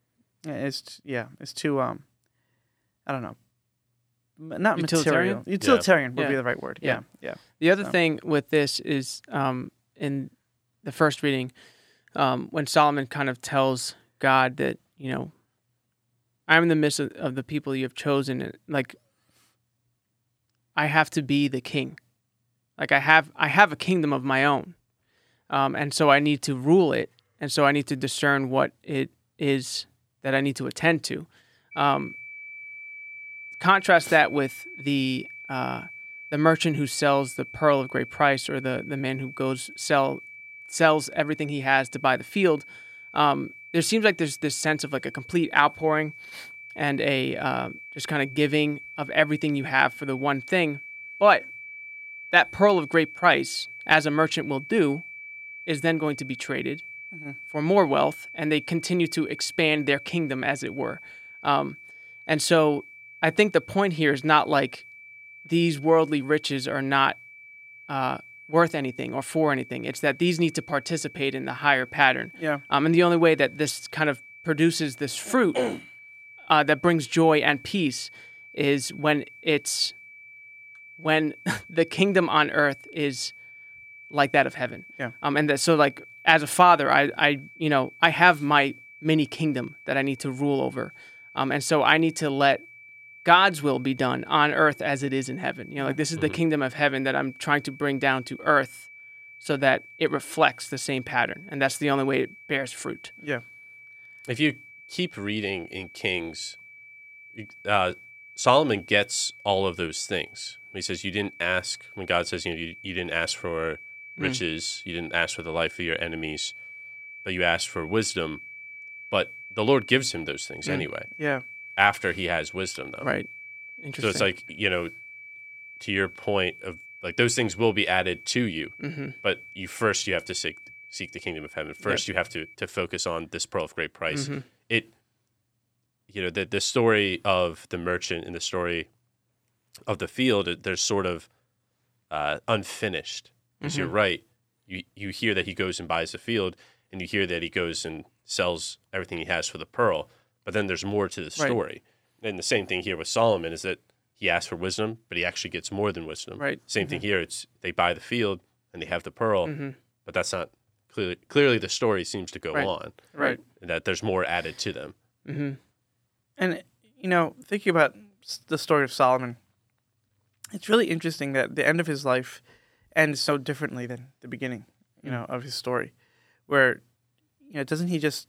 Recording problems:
high-pitched whine; noticeable; from 32 s to 2:13; 2.5 kHz, 15 dB below the speech

